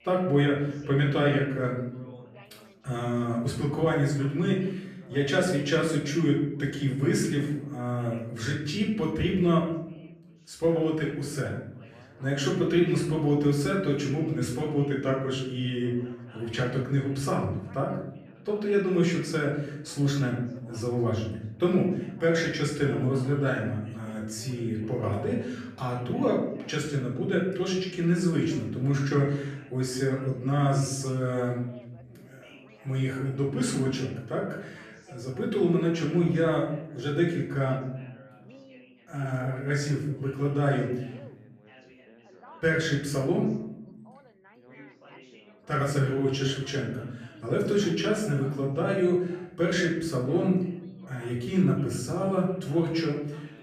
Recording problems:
off-mic speech; far
room echo; noticeable; dies away in 0.8 s
background chatter; faint; throughout; 3 voices, 25 dB below the speech

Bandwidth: 14.5 kHz